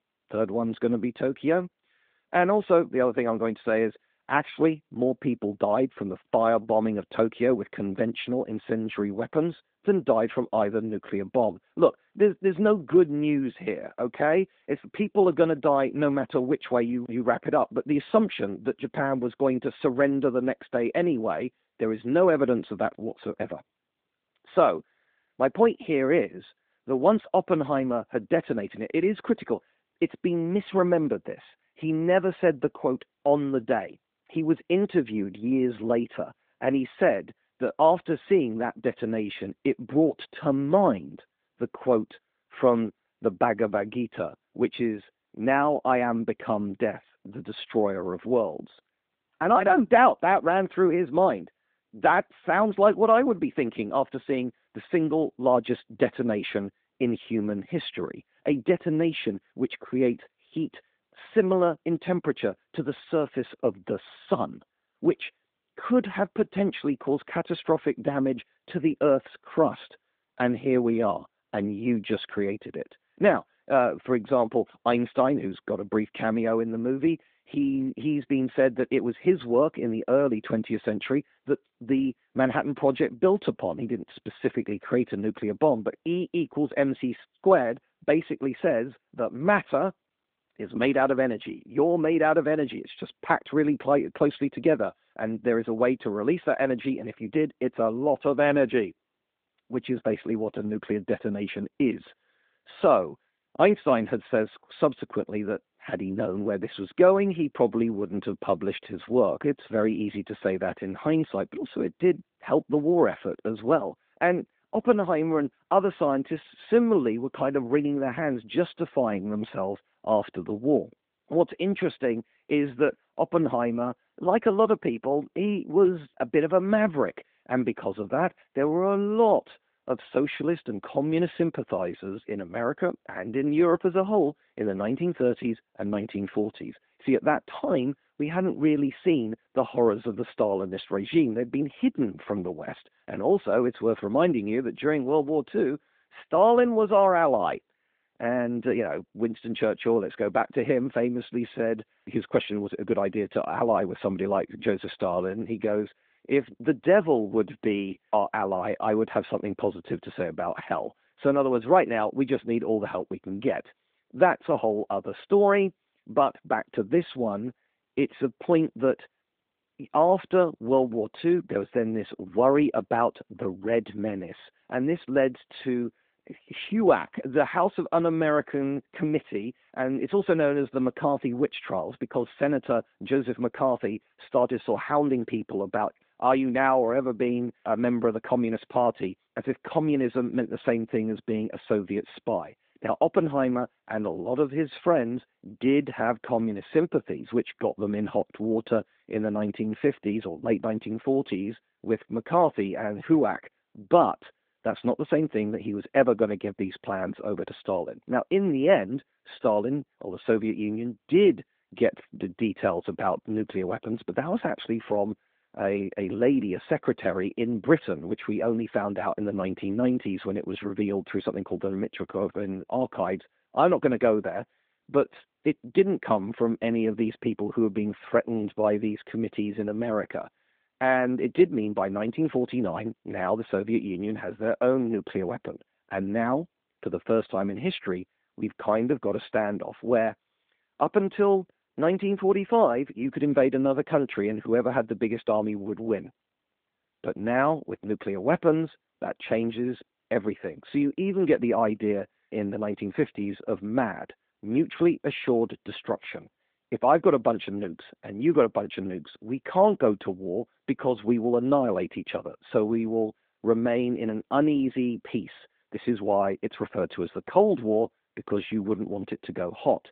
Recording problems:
phone-call audio; nothing above 3.5 kHz

